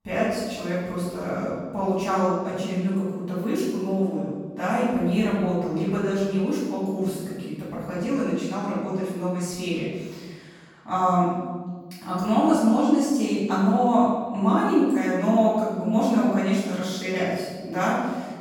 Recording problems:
room echo; strong; dies away in 1.4 s
off-mic speech; far

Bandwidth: 17.5 kHz